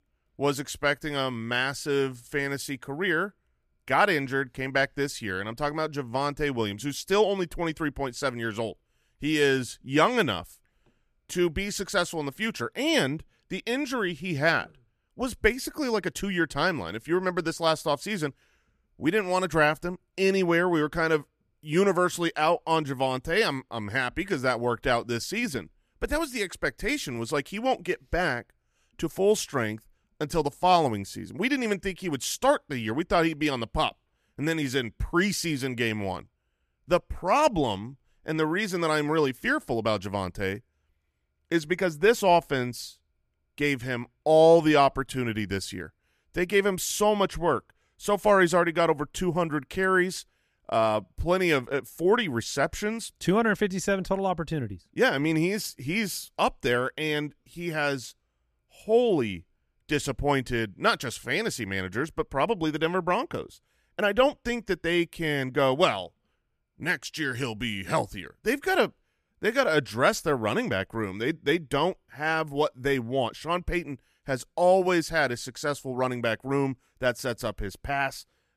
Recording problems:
none

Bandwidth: 14.5 kHz